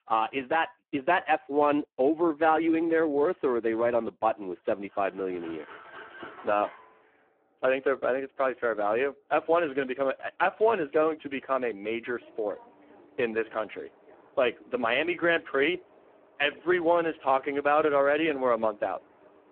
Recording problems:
phone-call audio; poor line
traffic noise; faint; from 5.5 s on; 25 dB below the speech

